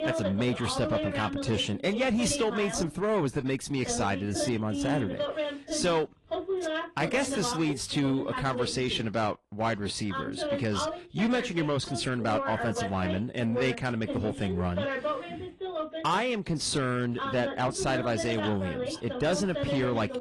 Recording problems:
distortion; slight; 10 dB below the speech
garbled, watery; slightly
voice in the background; loud; throughout; 5 dB below the speech

